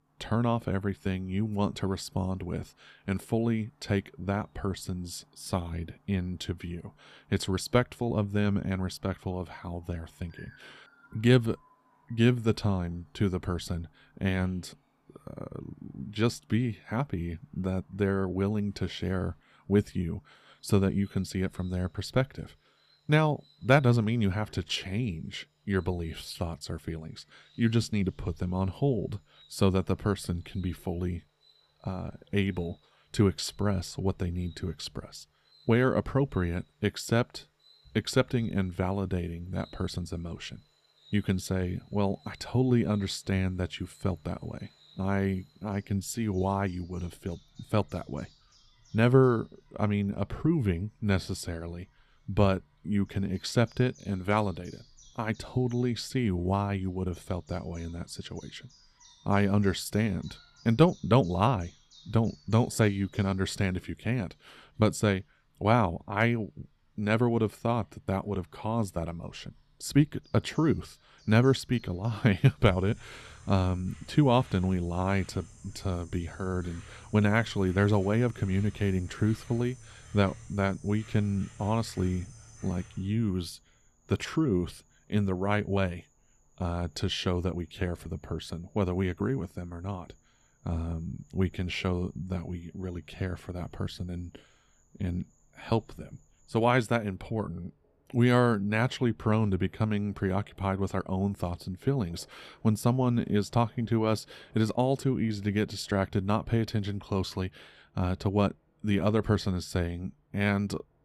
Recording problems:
animal sounds; faint; throughout; 25 dB below the speech

